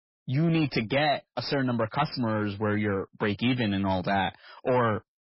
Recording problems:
garbled, watery; badly; nothing above 5.5 kHz
distortion; slight; 10 dB below the speech

